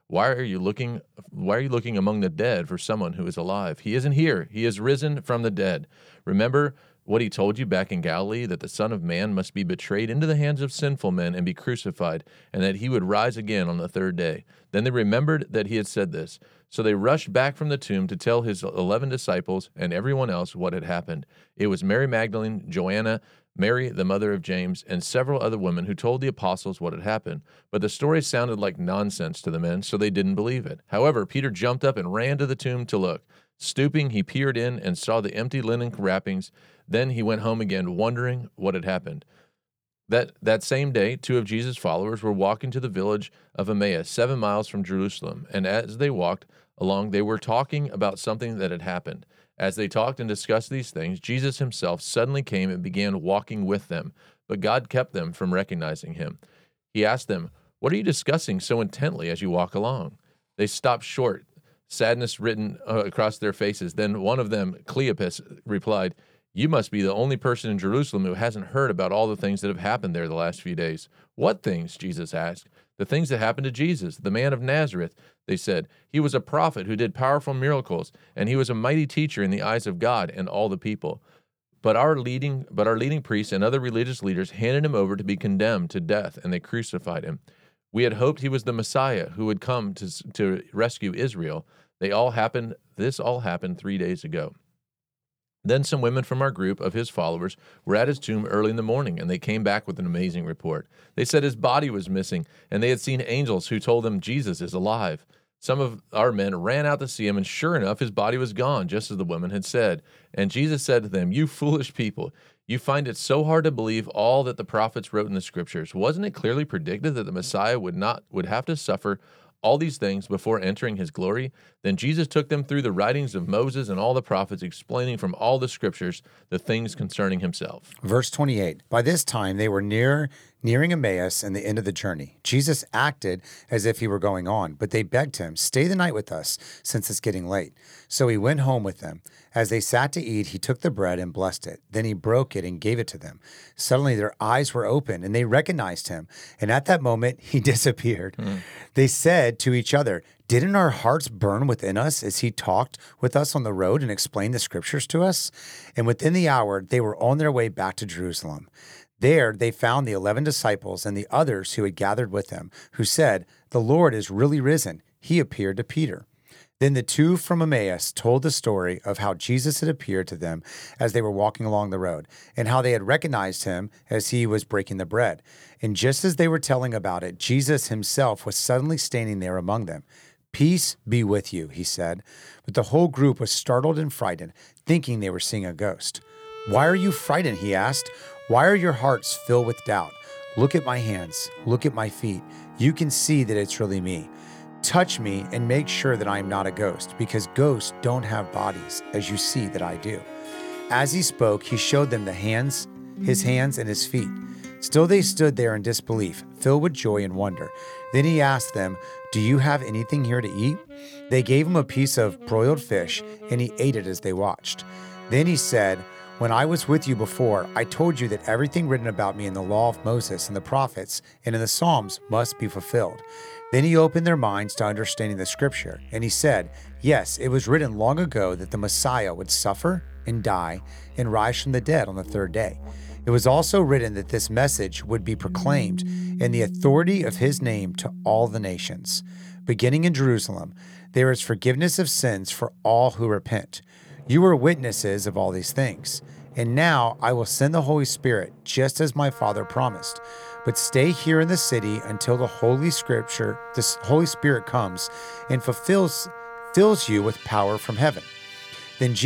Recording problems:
background music; noticeable; from 3:06 on; 15 dB below the speech
abrupt cut into speech; at the end

